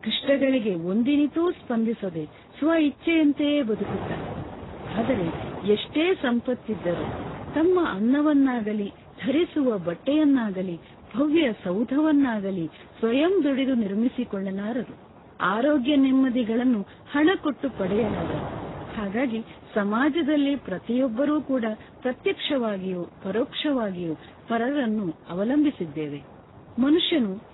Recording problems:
garbled, watery; badly; nothing above 4 kHz
wind noise on the microphone; occasional gusts; 15 dB below the speech

